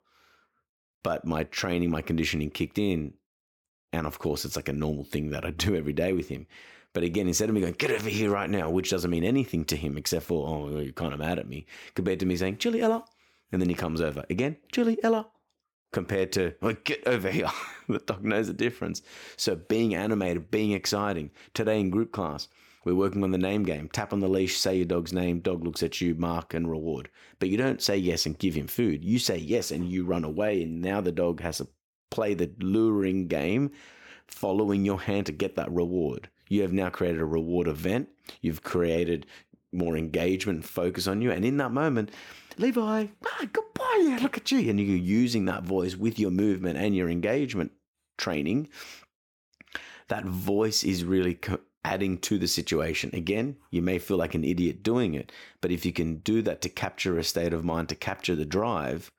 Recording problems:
none

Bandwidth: 18 kHz